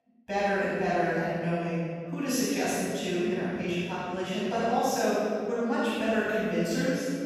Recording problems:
room echo; strong; dies away in 2.4 s
off-mic speech; far
echo of what is said; noticeable; from 4.5 s on; 290 ms later, 20 dB below the speech

